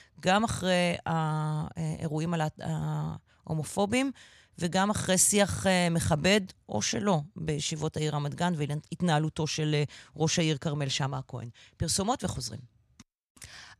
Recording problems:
none

